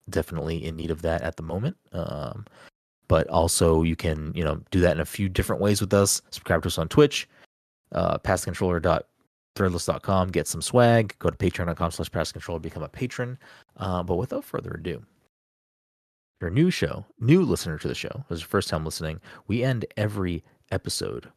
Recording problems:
none

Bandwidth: 13.5 kHz